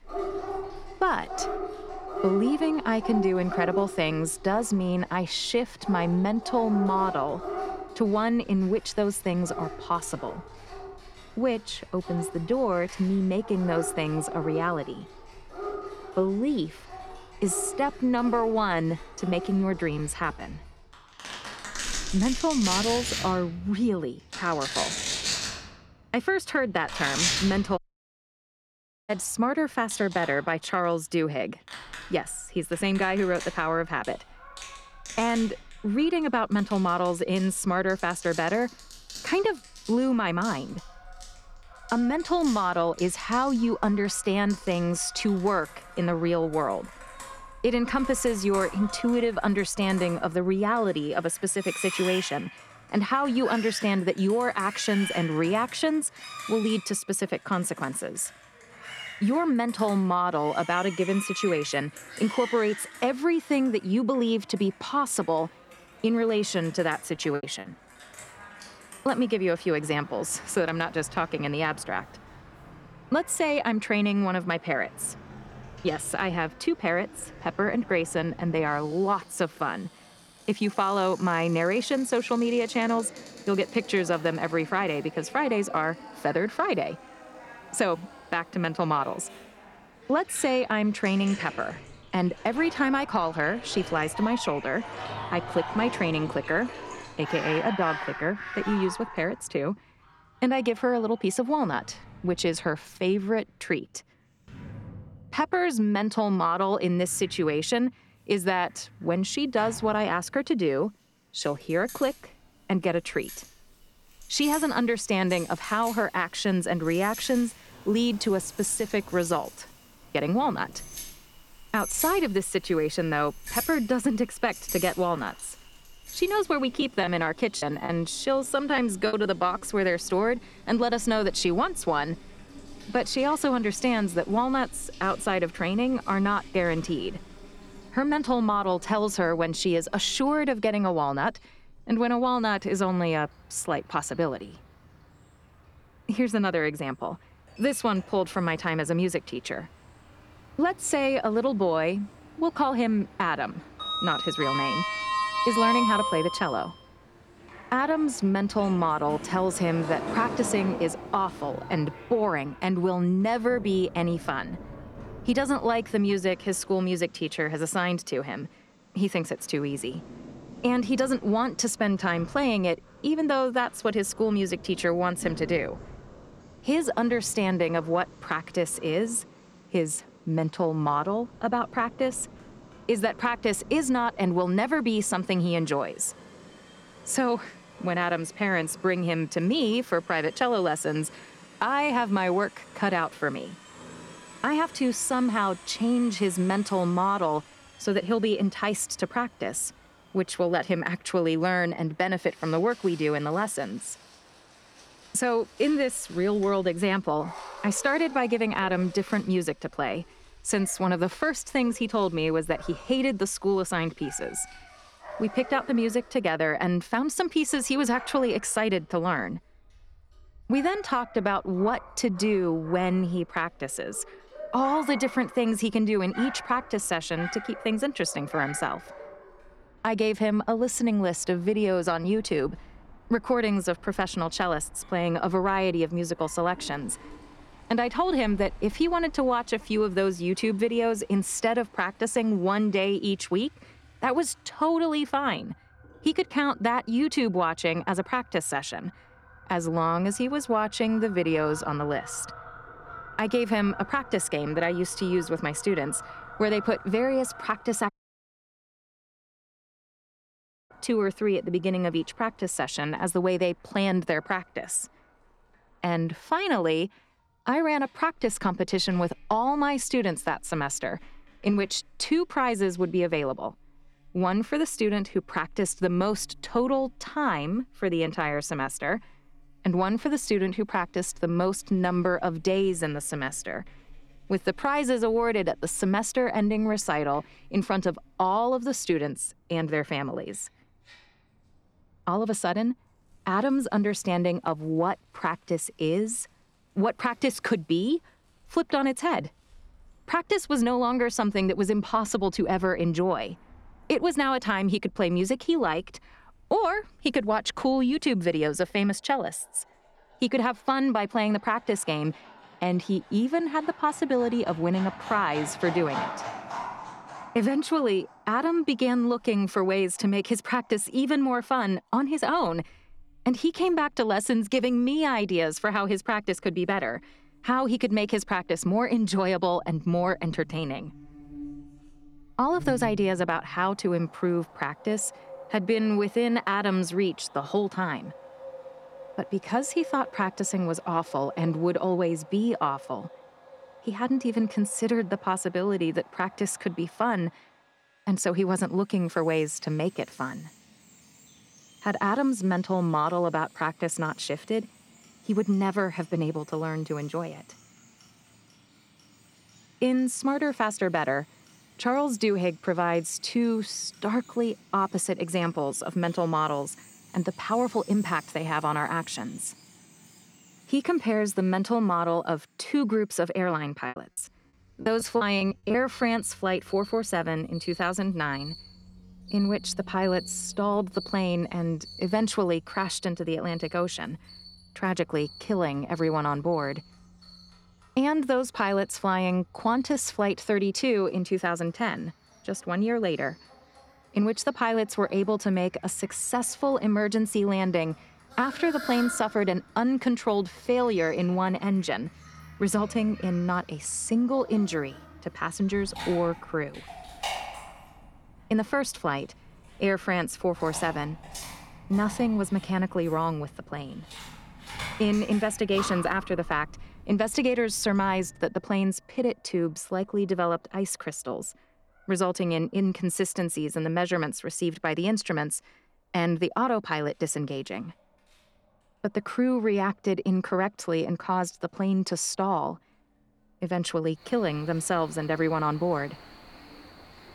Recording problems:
animal sounds; noticeable; throughout; 15 dB below the speech
household noises; noticeable; throughout; 15 dB below the speech
audio cutting out; at 28 s for 1.5 s and at 4:18 for 3 s
choppy; very; at 1:07, from 2:07 to 2:09 and from 6:14 to 6:16; 14% of the speech affected

